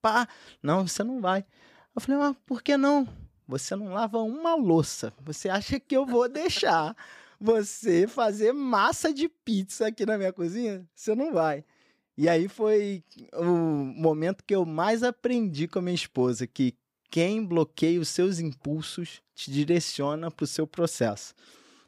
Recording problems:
none

